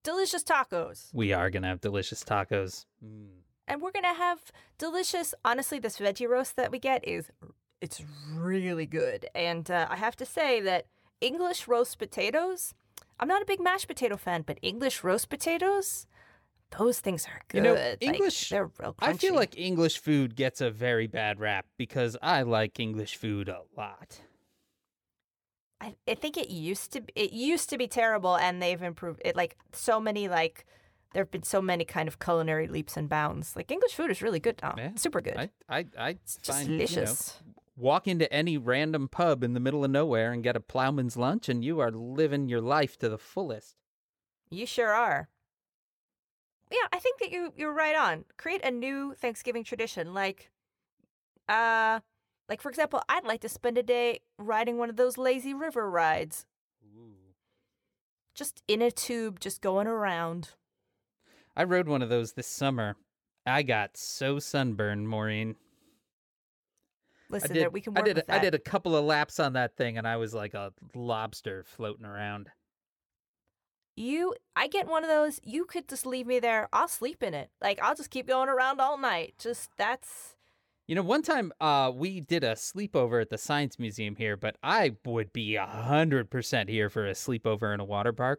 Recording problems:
none

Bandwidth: 18.5 kHz